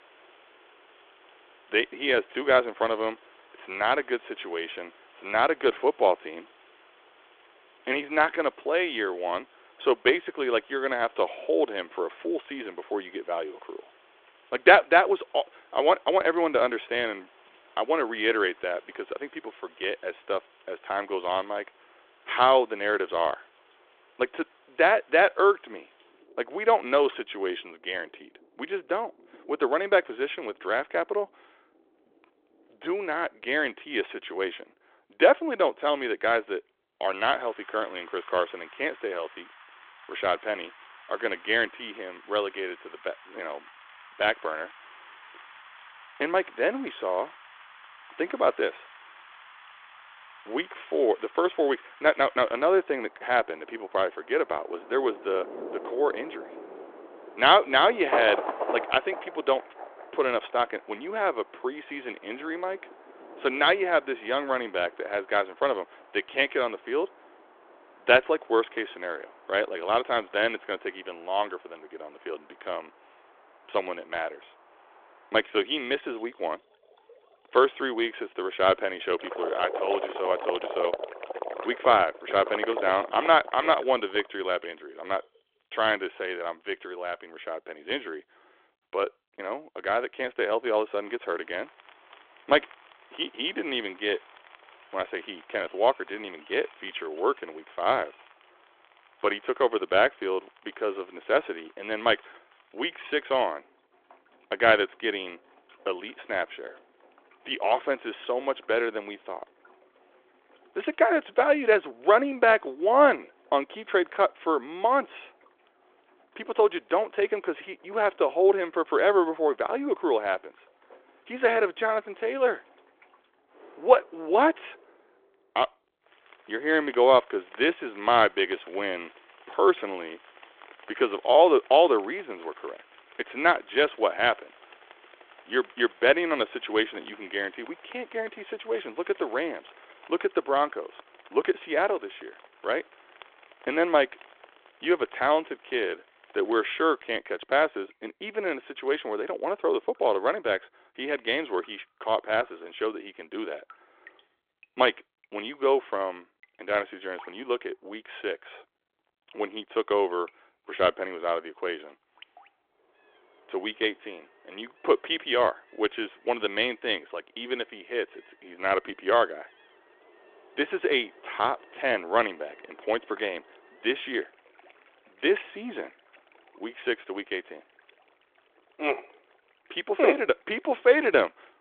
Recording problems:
phone-call audio; nothing above 3.5 kHz
rain or running water; noticeable; throughout; 20 dB below the speech

